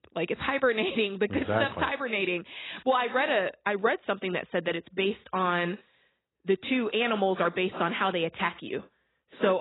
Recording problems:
garbled, watery; badly; nothing above 4 kHz
abrupt cut into speech; at the end

